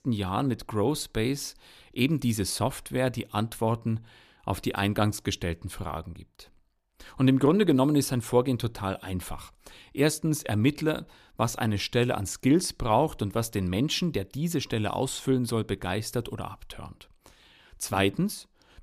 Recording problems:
none

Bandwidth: 14.5 kHz